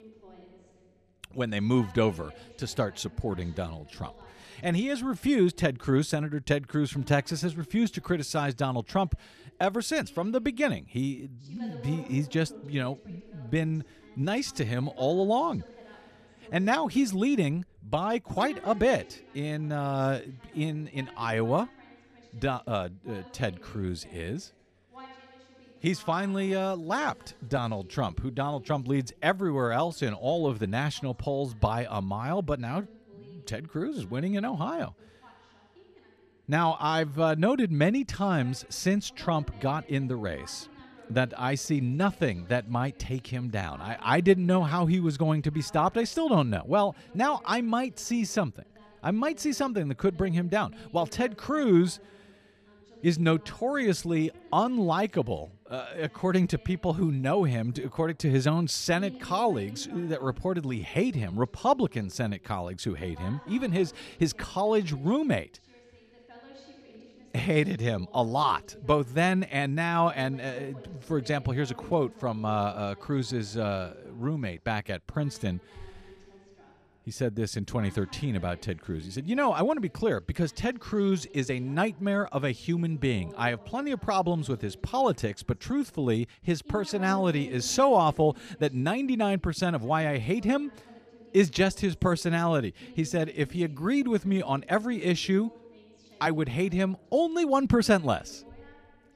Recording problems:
voice in the background; faint; throughout; 25 dB below the speech

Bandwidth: 14 kHz